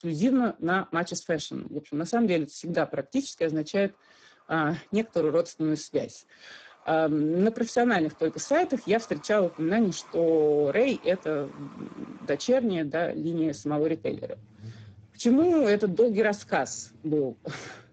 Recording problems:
garbled, watery; badly; nothing above 7.5 kHz
traffic noise; faint; throughout; 25 dB below the speech

